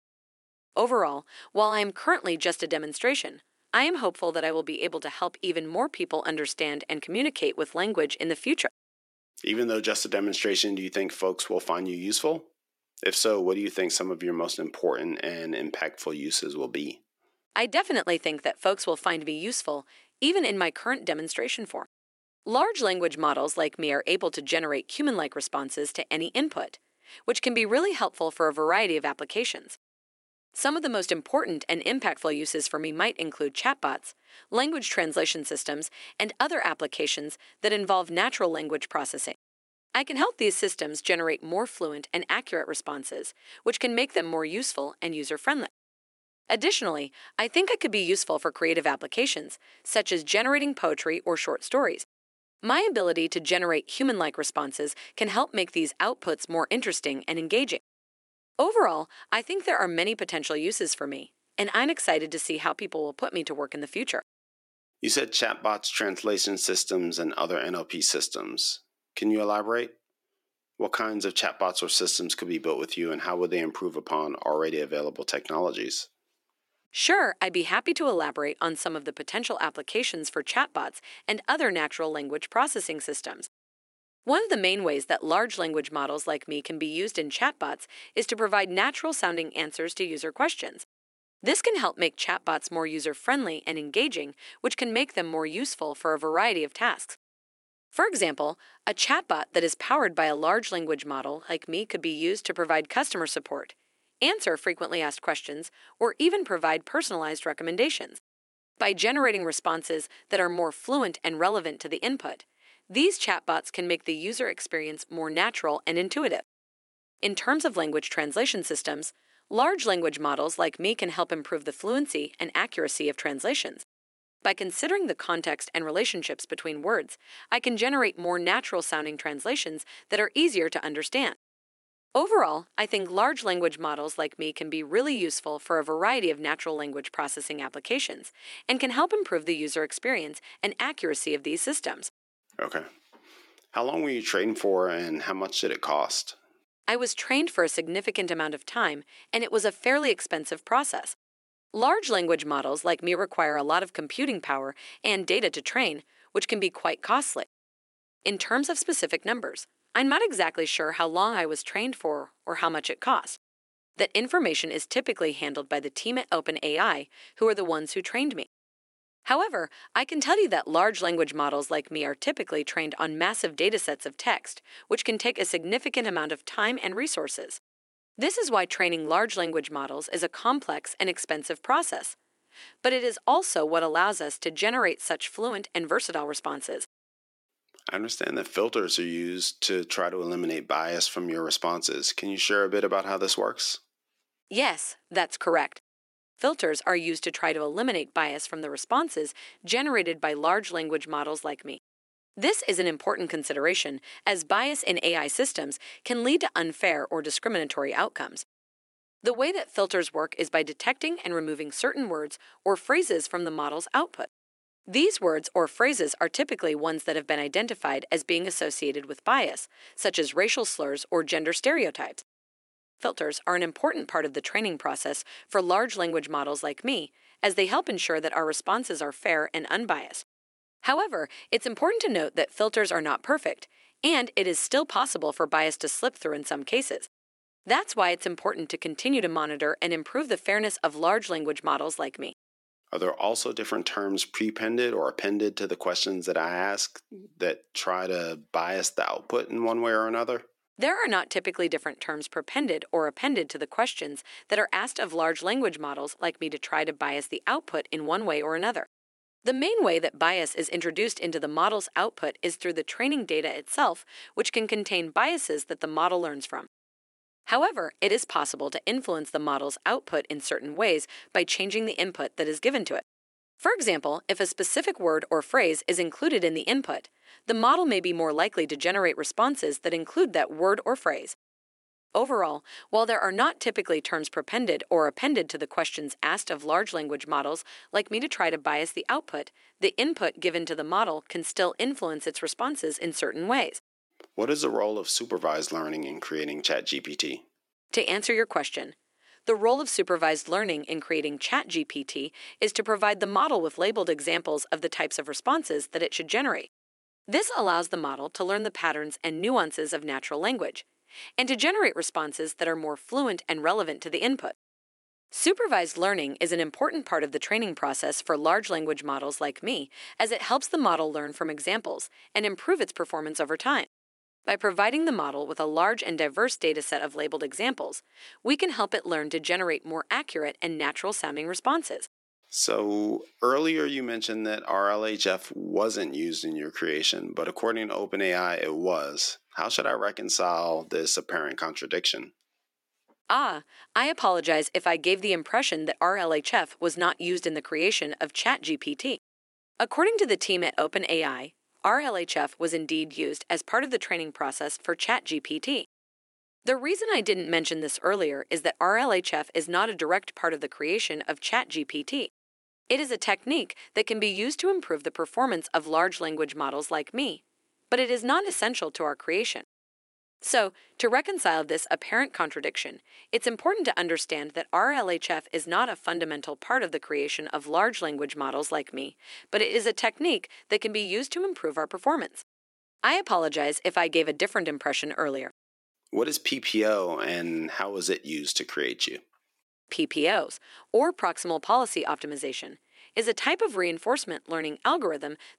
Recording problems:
thin; very slightly; fading below 300 Hz

